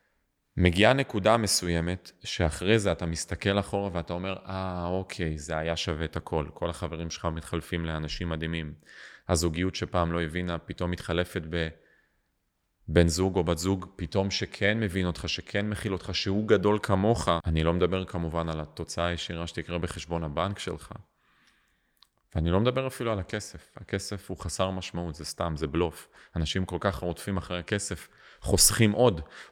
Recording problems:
none

